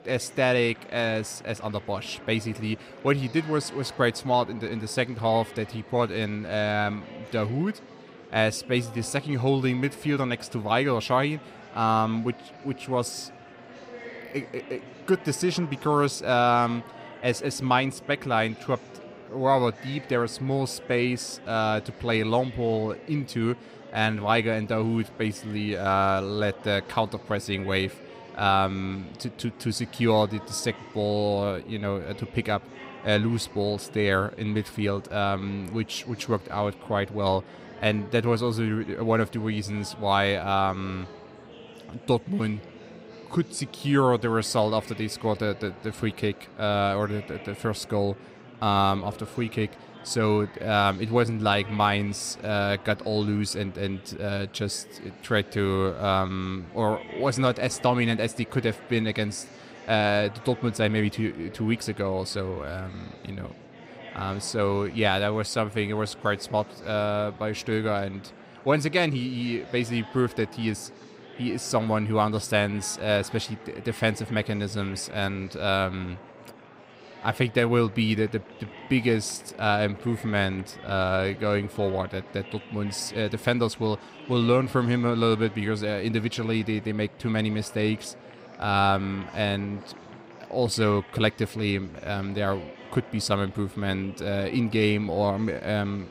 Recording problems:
murmuring crowd; noticeable; throughout; 20 dB below the speech

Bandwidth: 15.5 kHz